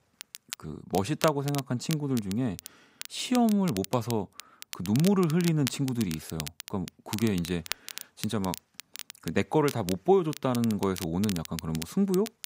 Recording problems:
crackle, like an old record; noticeable; 10 dB below the speech

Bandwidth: 15.5 kHz